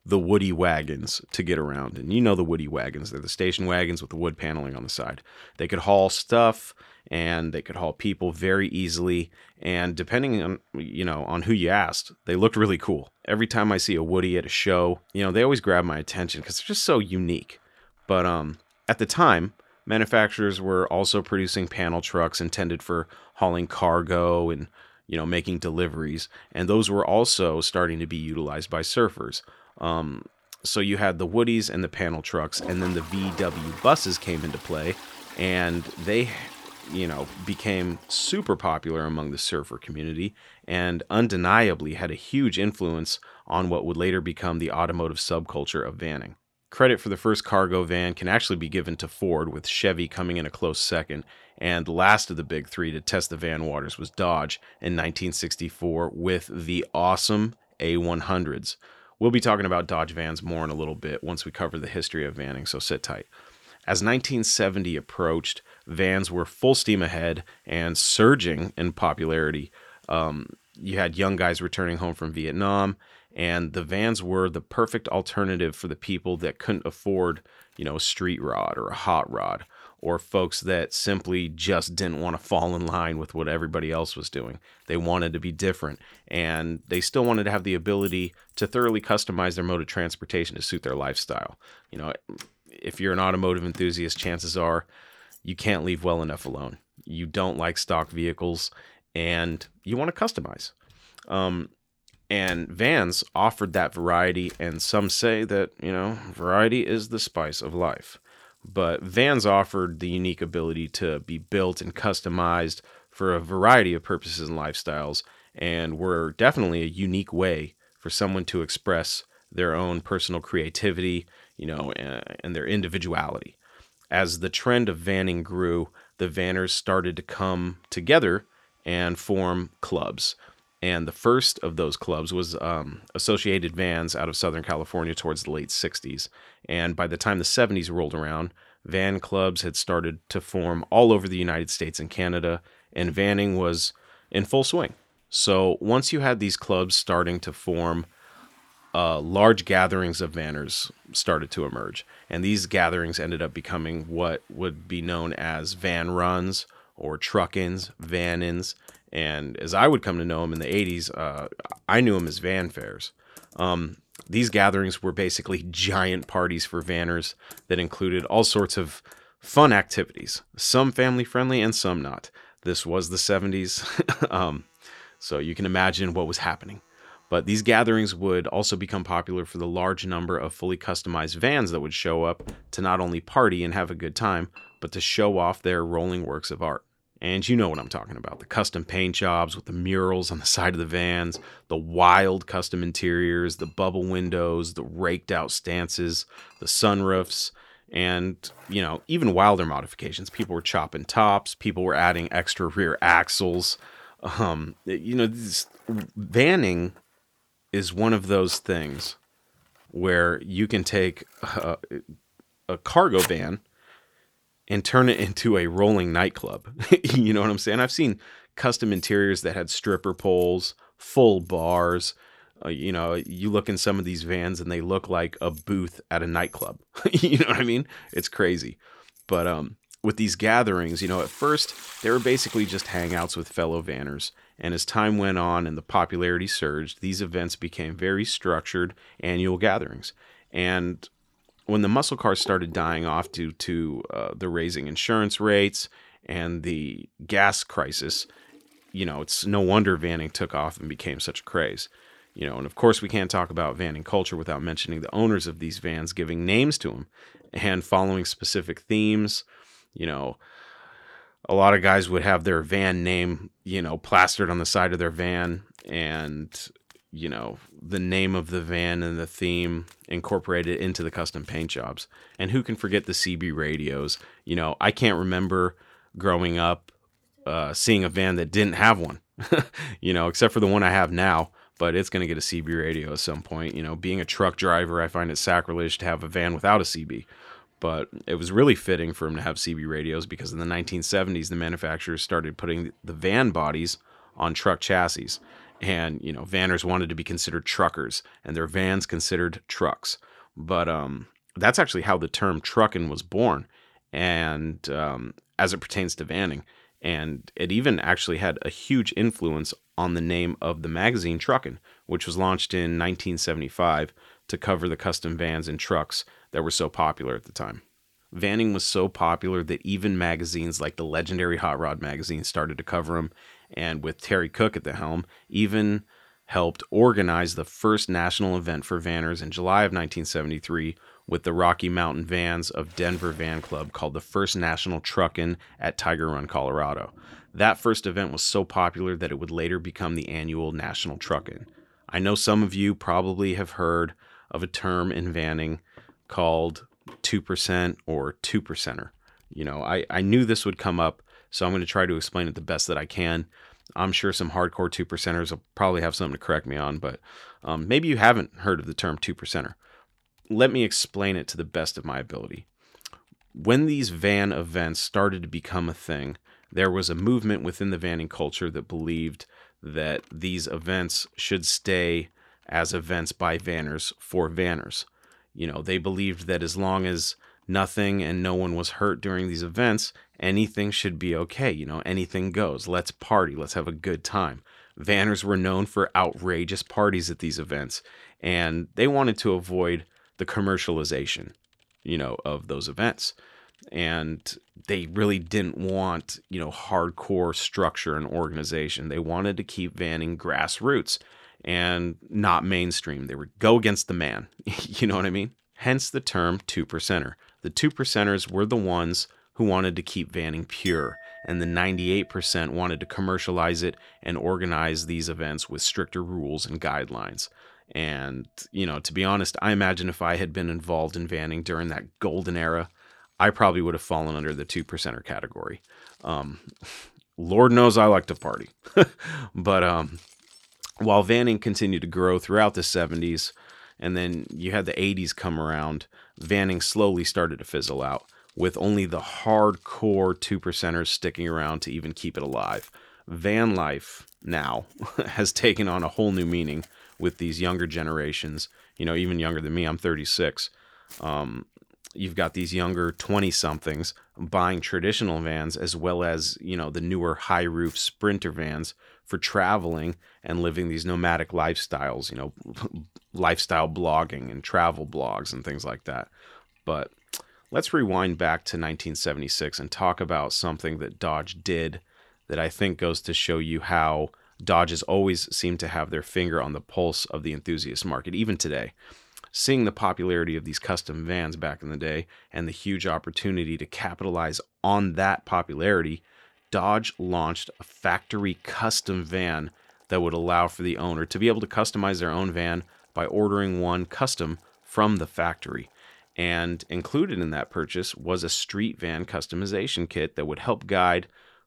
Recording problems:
household noises; faint; throughout; 20 dB below the speech

